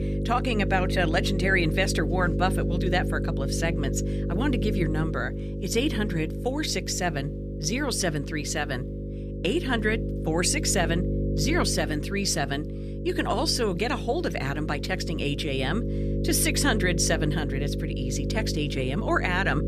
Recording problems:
electrical hum; loud; throughout; 50 Hz, 9 dB below the speech

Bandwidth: 14.5 kHz